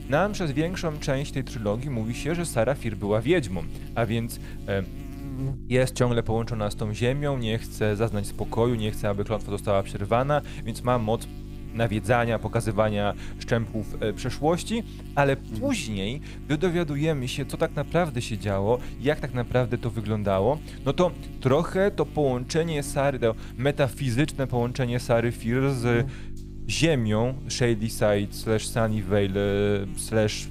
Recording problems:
electrical hum; noticeable; throughout; 50 Hz, 20 dB below the speech

